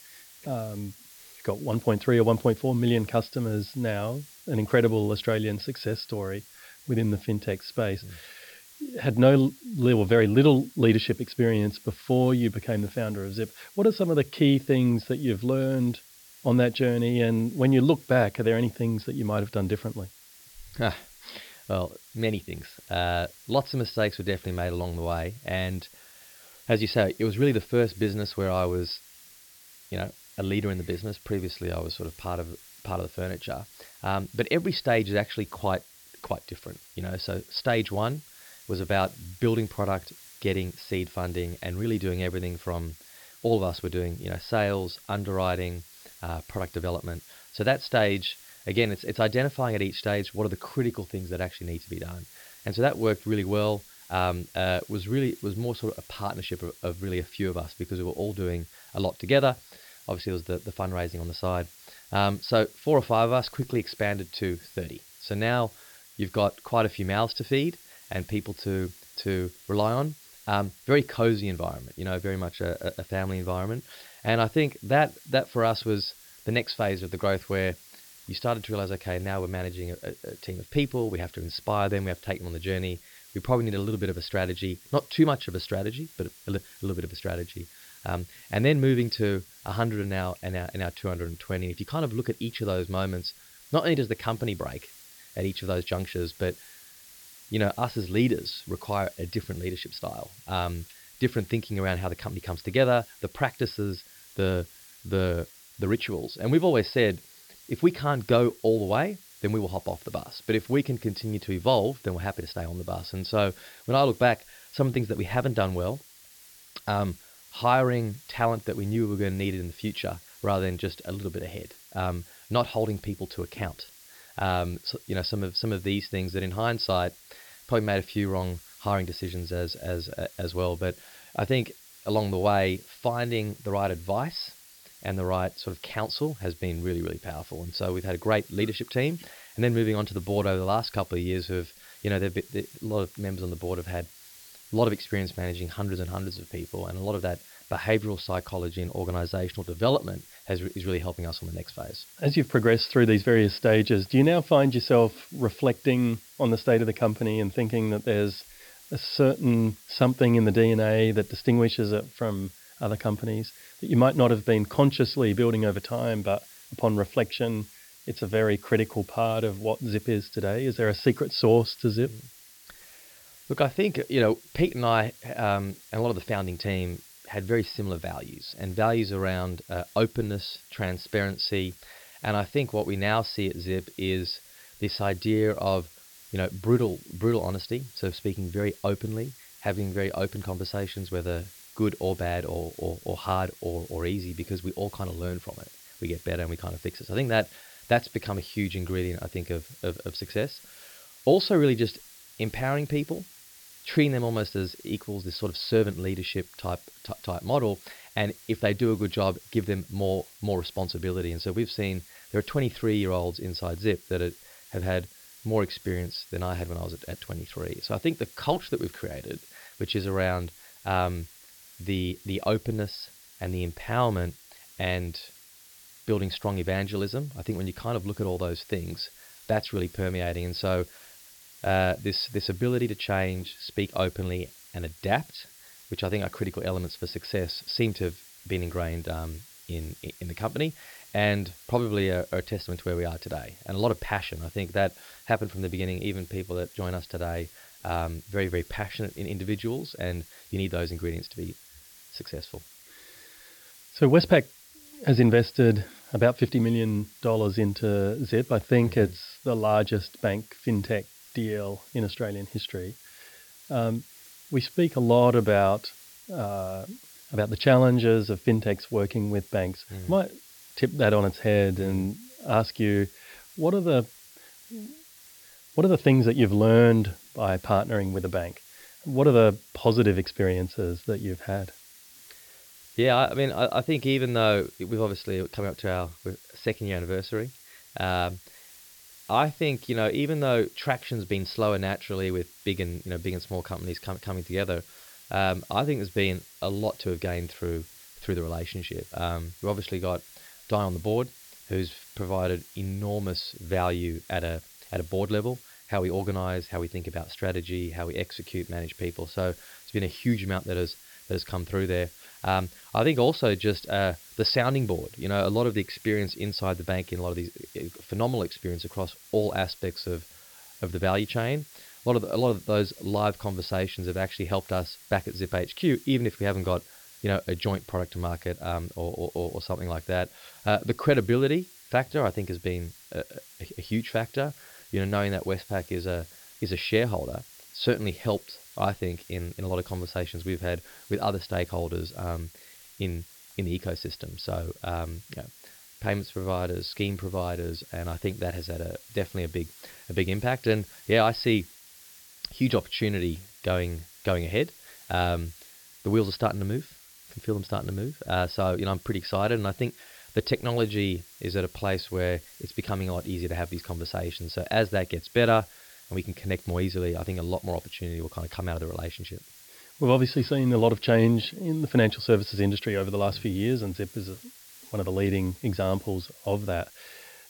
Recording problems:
high frequencies cut off; noticeable; nothing above 5.5 kHz
hiss; faint; throughout; 20 dB below the speech

